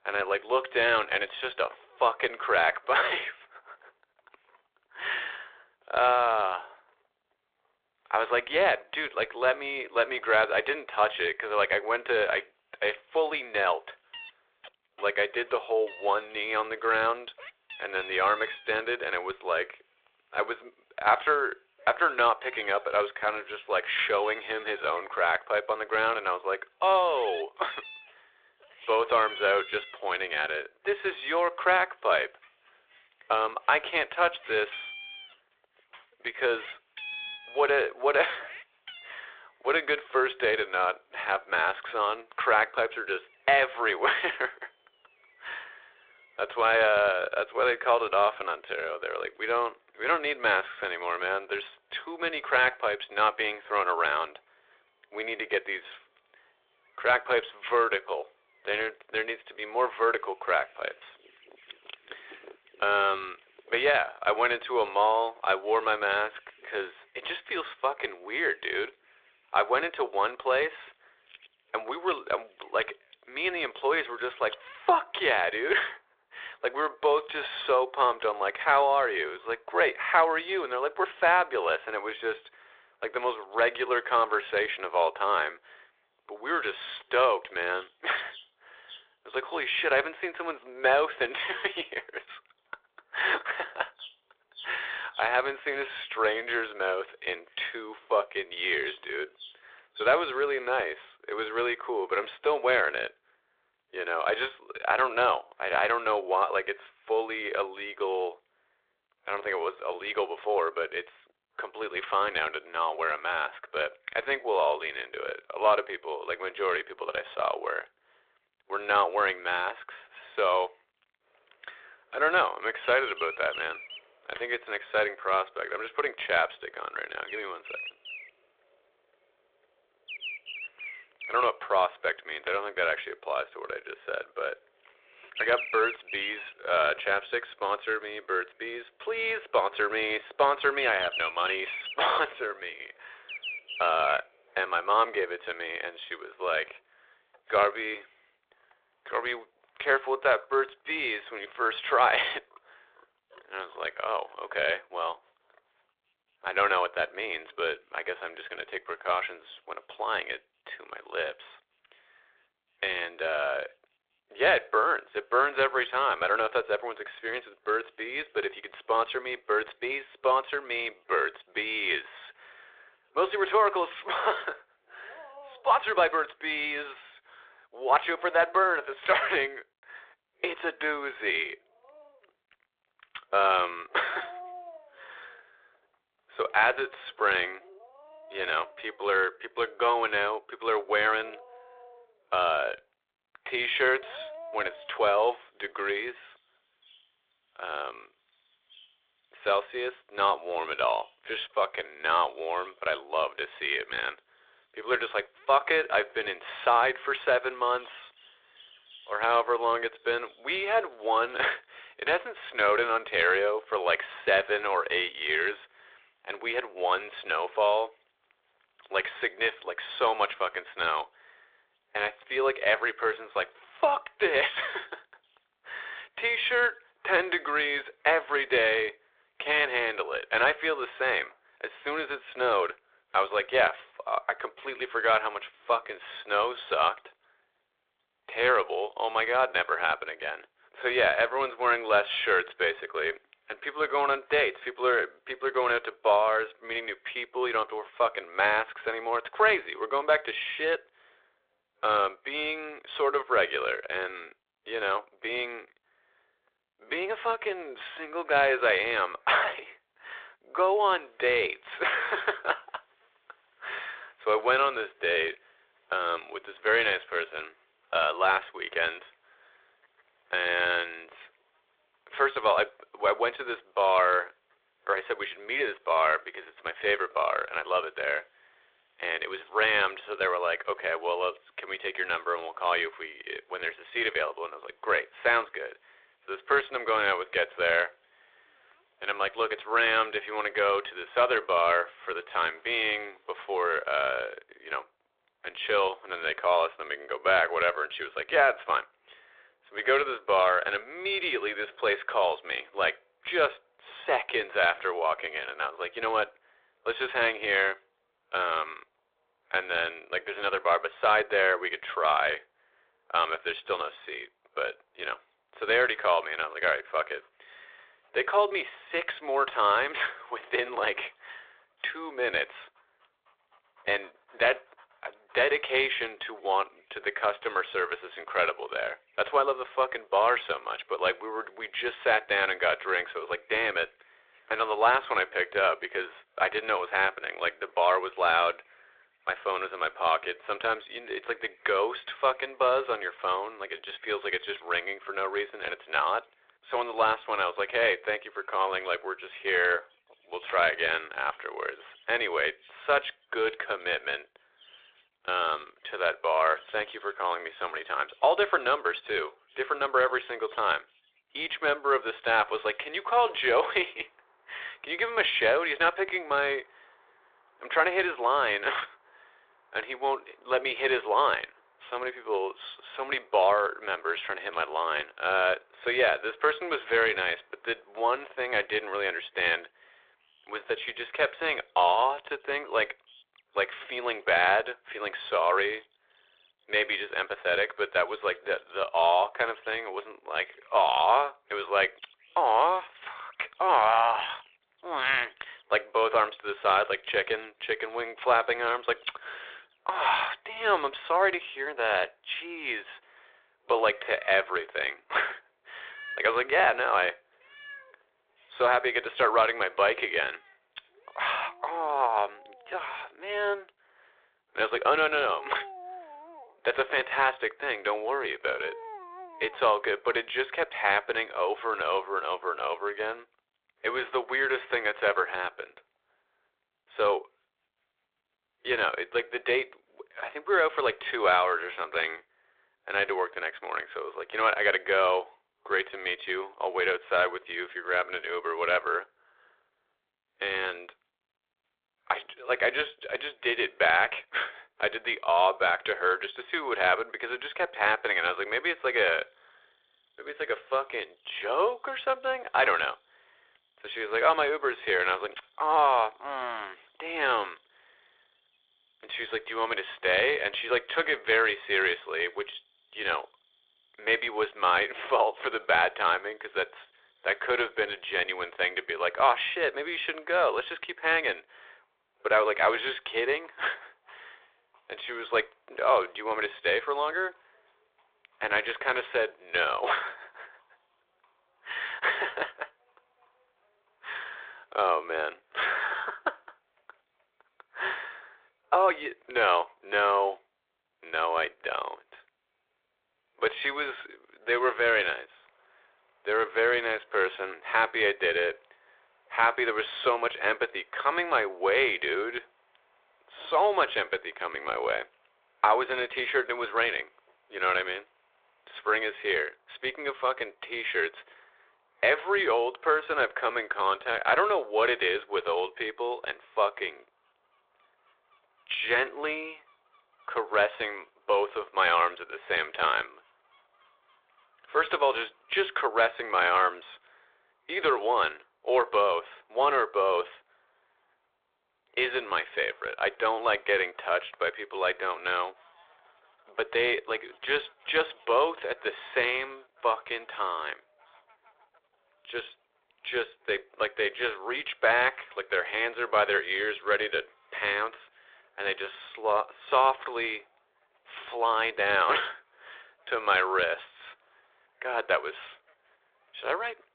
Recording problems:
phone-call audio
animal sounds; noticeable; throughout; 20 dB below the speech

